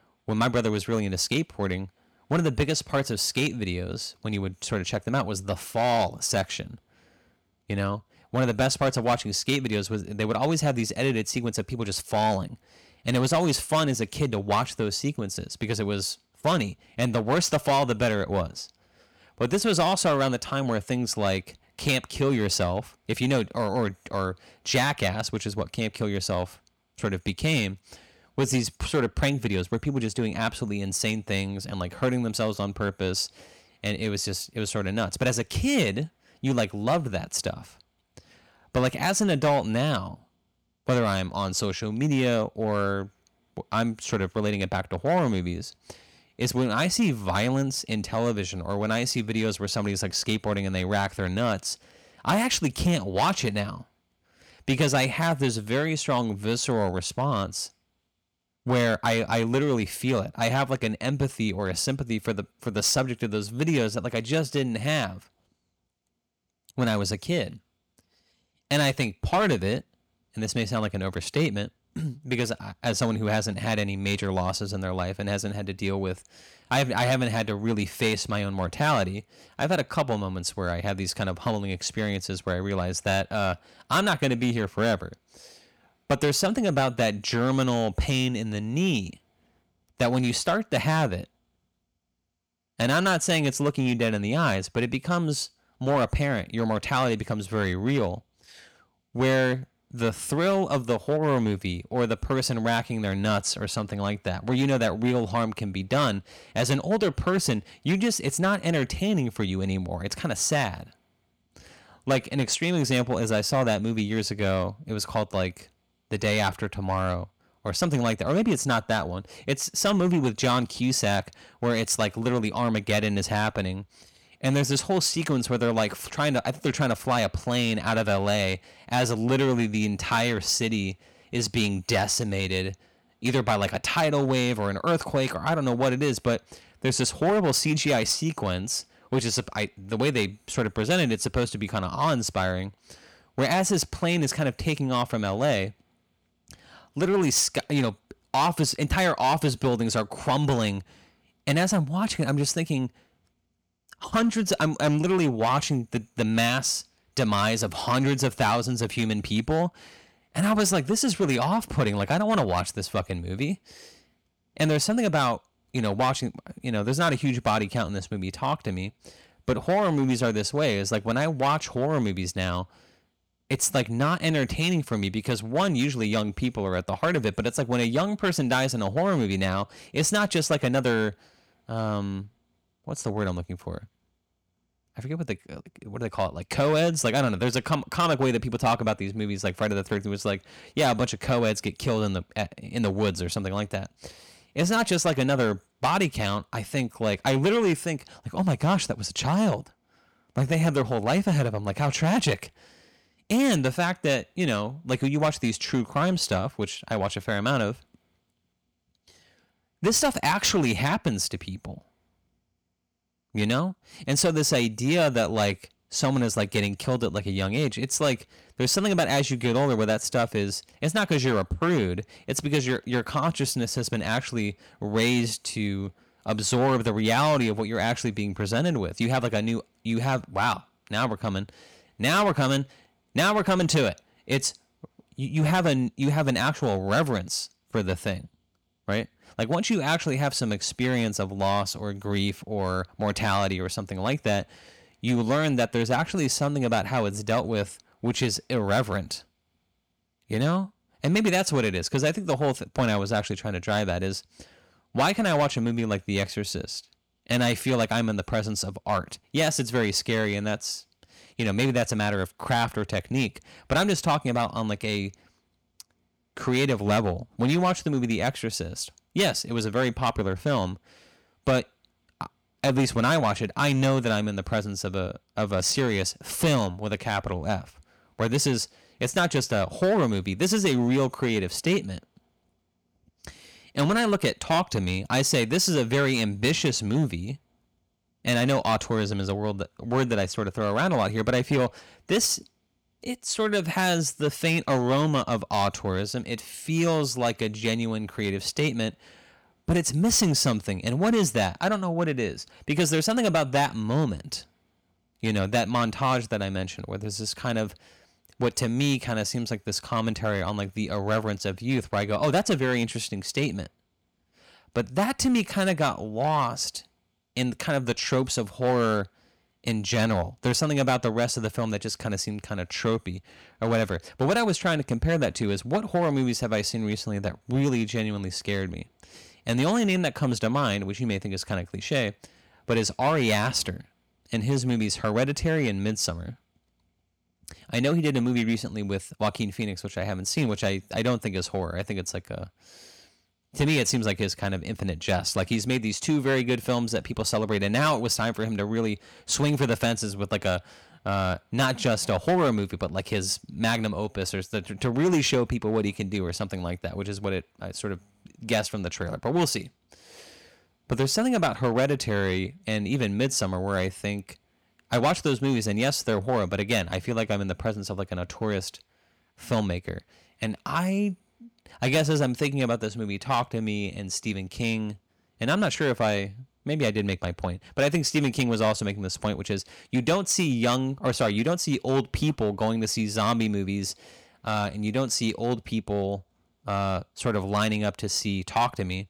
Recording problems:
distortion; slight; 4% of the sound clipped

